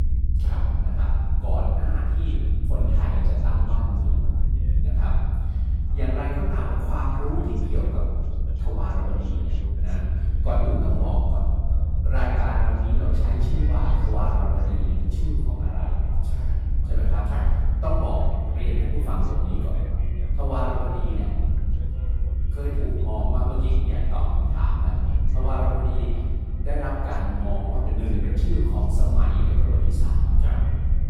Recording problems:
room echo; strong; dies away in 1.6 s
off-mic speech; far
echo of what is said; faint; from 12 s on; 460 ms later, 20 dB below the speech
low rumble; loud; throughout; 8 dB below the speech
voice in the background; faint; throughout; 20 dB below the speech

